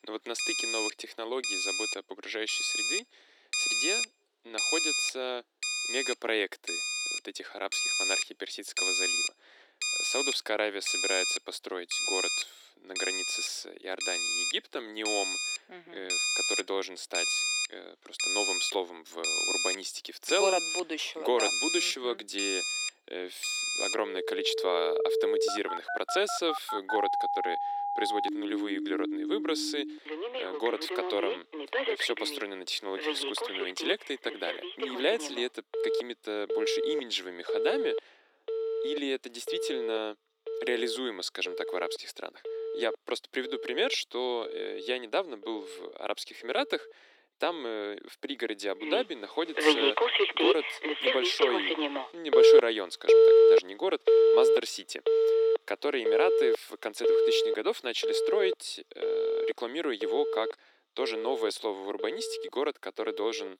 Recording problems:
thin; somewhat; fading below 300 Hz
alarms or sirens; very loud; throughout; 5 dB above the speech

